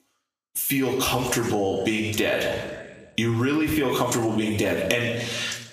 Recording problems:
squashed, flat; heavily
room echo; slight; dies away in 0.7 s
off-mic speech; somewhat distant
thin; very slightly; fading below 550 Hz

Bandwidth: 15 kHz